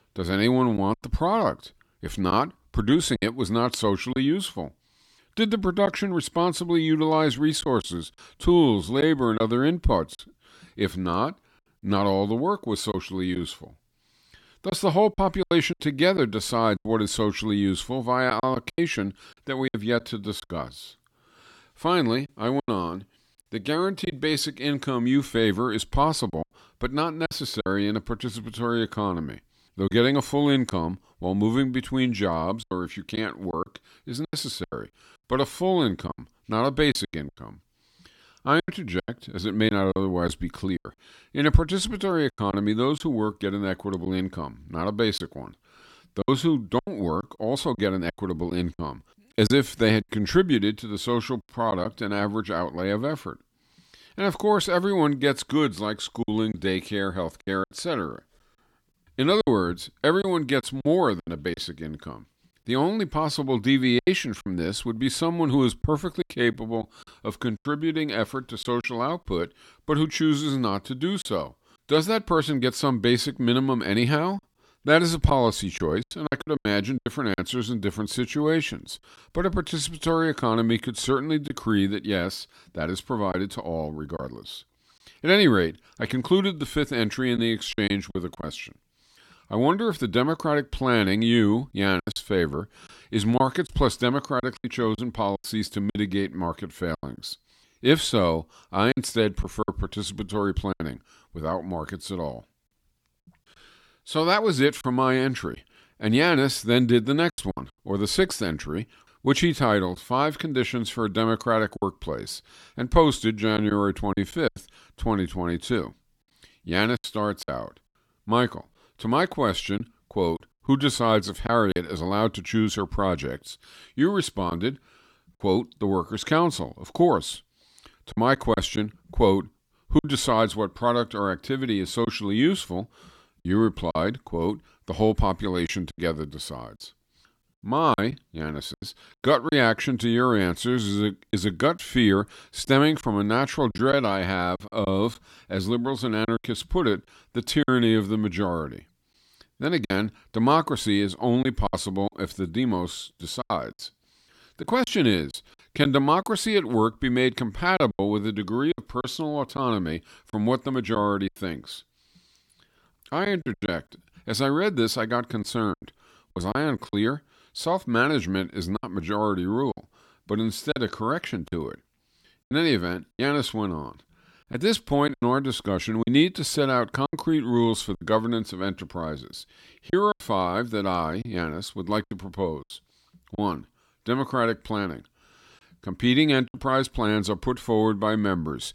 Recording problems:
choppy; very; 6% of the speech affected

